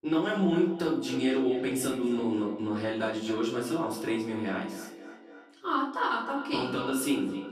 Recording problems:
echo of what is said; strong; throughout; 260 ms later, 10 dB below the speech
off-mic speech; far
room echo; slight; dies away in 0.4 s

